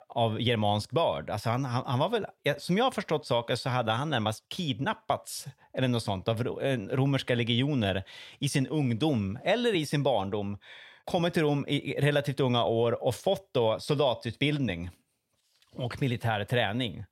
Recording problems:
none

